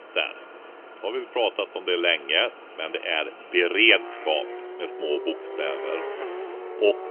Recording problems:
phone-call audio; nothing above 3 kHz
traffic noise; noticeable; throughout; 15 dB below the speech

